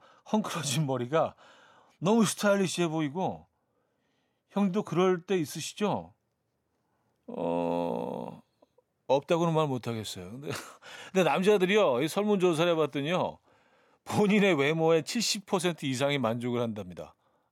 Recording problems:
none

